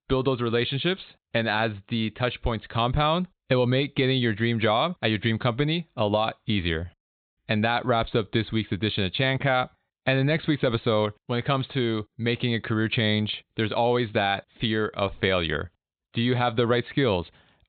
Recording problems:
high frequencies cut off; severe; nothing above 4 kHz

